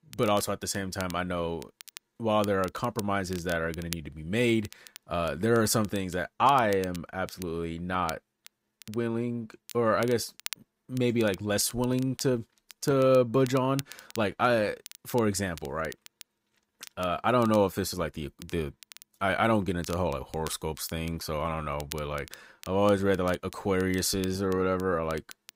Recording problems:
crackle, like an old record; noticeable; 20 dB below the speech

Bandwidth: 15.5 kHz